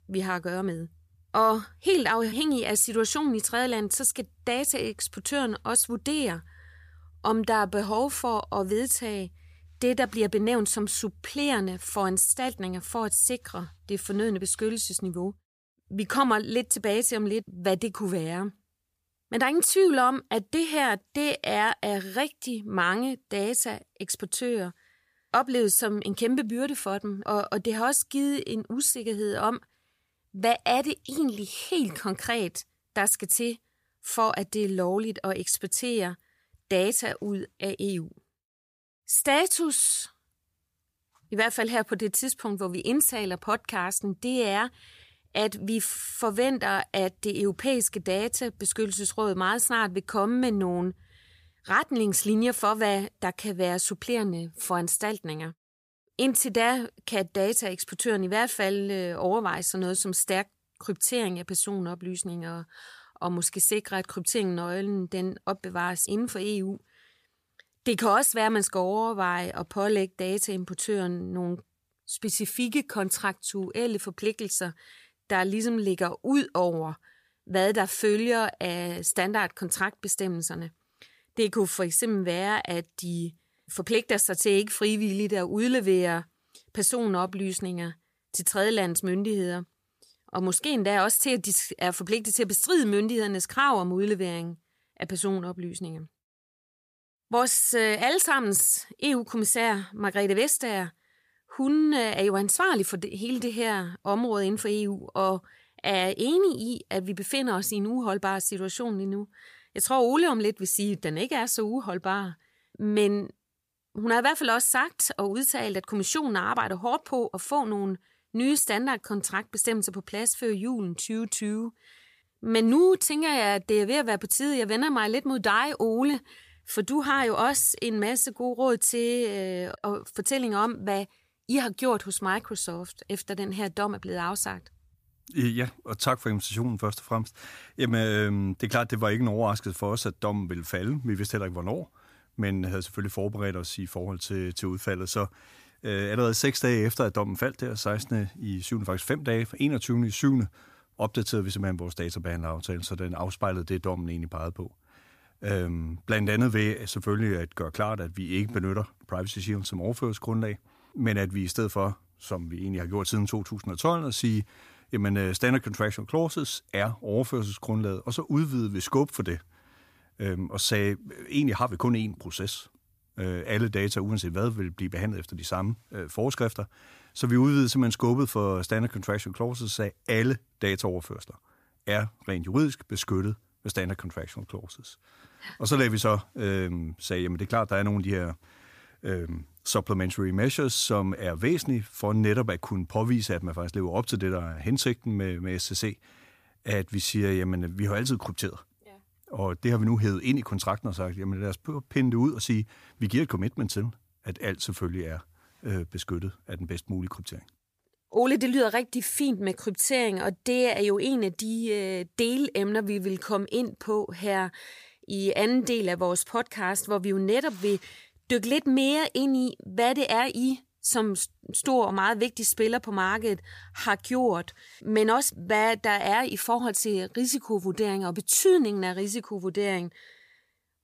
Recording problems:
none

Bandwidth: 15 kHz